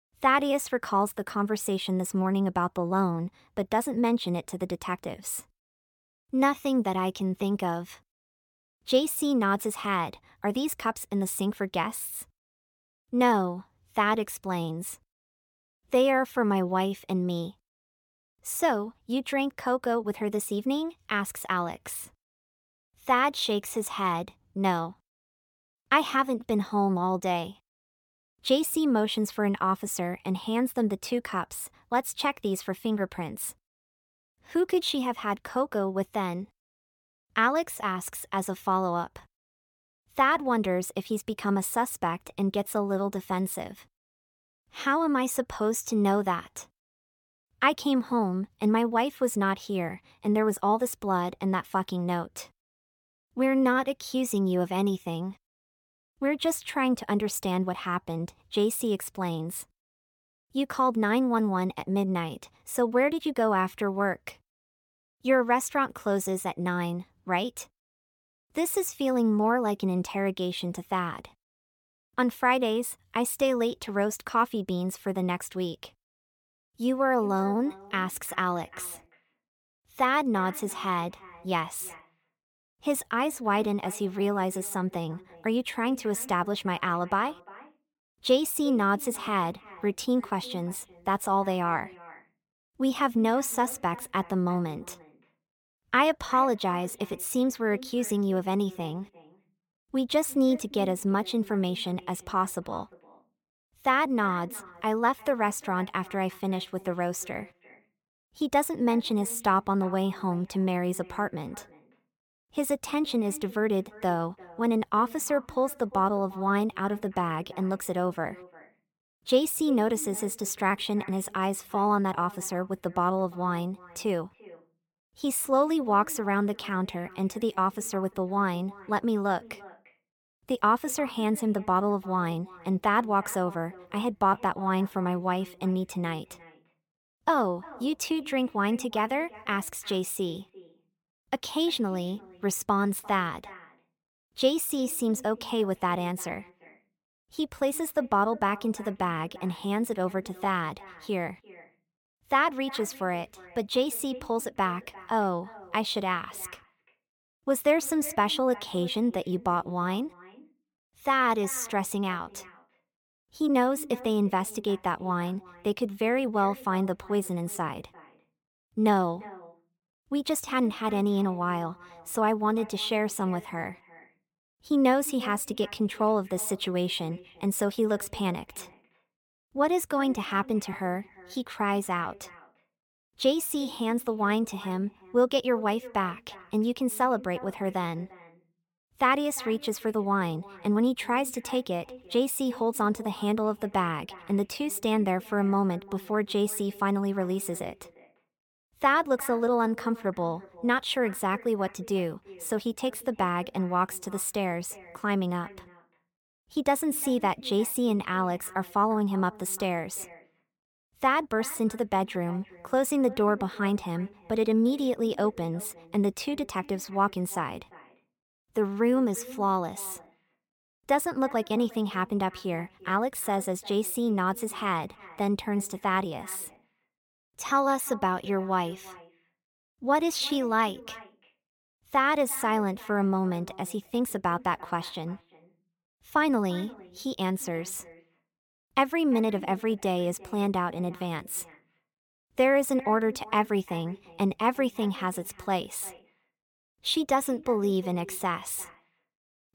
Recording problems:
echo of what is said; faint; from 1:17 on; 350 ms later, 20 dB below the speech

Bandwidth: 17.5 kHz